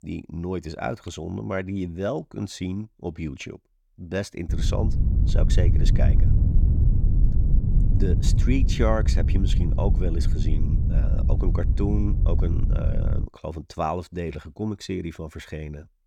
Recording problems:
wind noise on the microphone; heavy; from 4.5 to 13 s; 6 dB below the speech

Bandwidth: 17.5 kHz